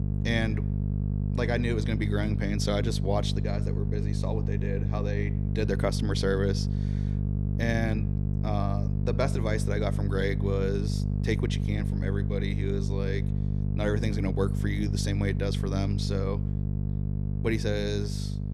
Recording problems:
electrical hum; loud; throughout; 50 Hz, 7 dB below the speech

